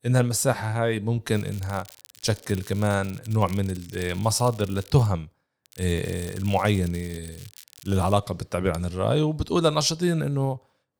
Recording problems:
crackling; faint; from 1.5 to 5 s and from 5.5 to 8 s; 20 dB below the speech

